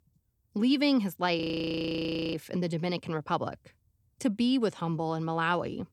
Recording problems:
audio freezing; at 1.5 s for 1 s

